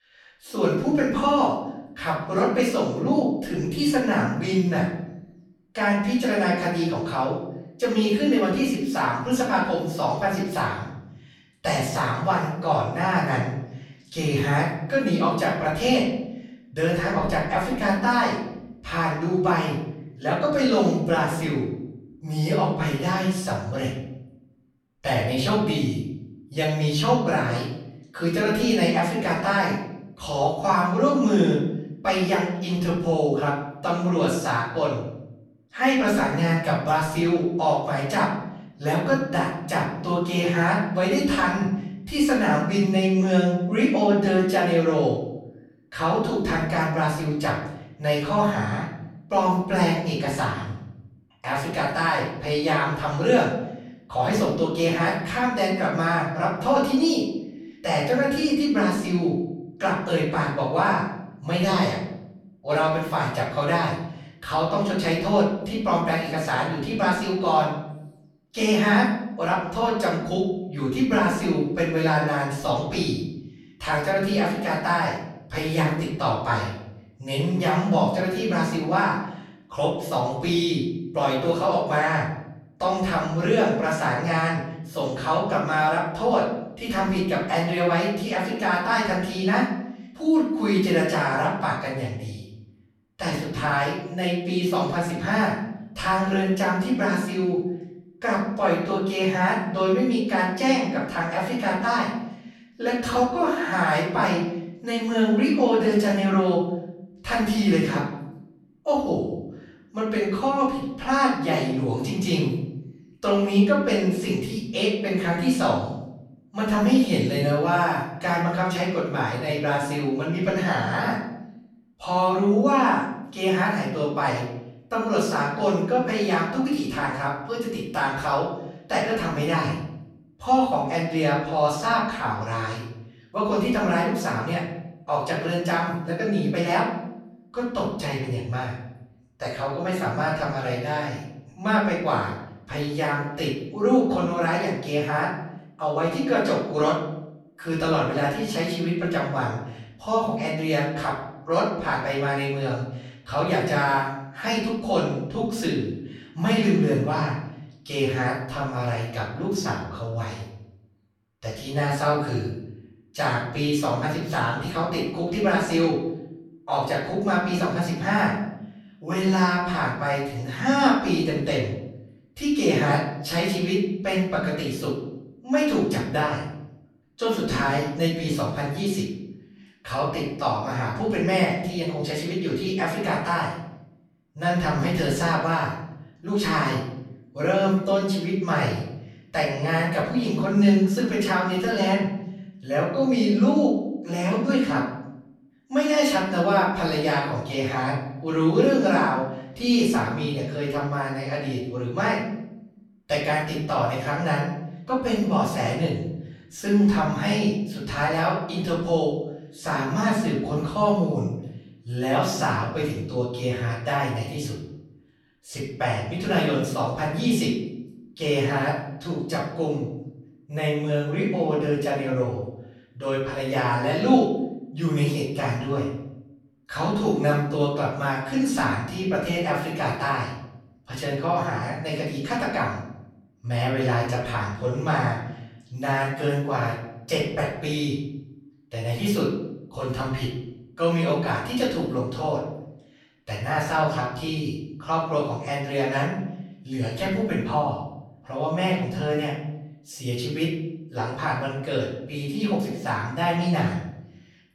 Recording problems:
off-mic speech; far
room echo; noticeable; dies away in 0.8 s

